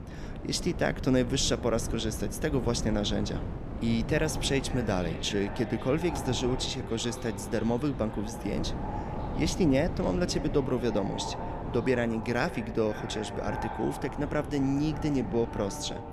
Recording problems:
echo of what is said; strong; from 4 s on; 550 ms later, 10 dB below the speech
wind noise on the microphone; occasional gusts; 10 dB below the speech

